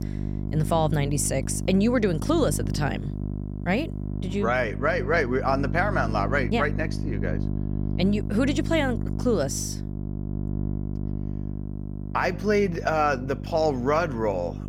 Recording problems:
electrical hum; noticeable; throughout; 50 Hz, 15 dB below the speech

